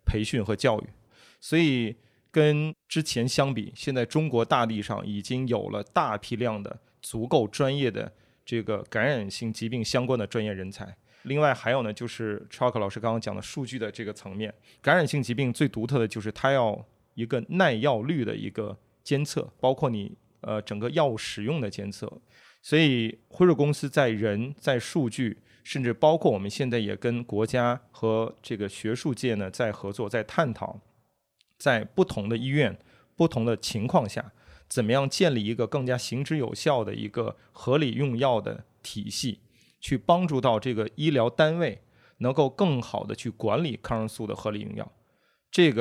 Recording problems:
abrupt cut into speech; at the end

